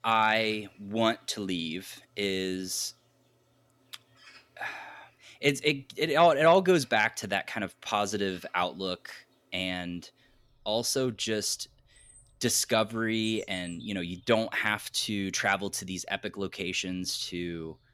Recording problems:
animal sounds; faint; throughout; 30 dB below the speech

